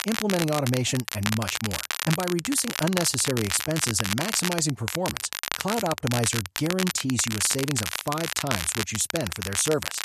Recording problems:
crackle, like an old record; loud; 3 dB below the speech

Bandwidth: 13.5 kHz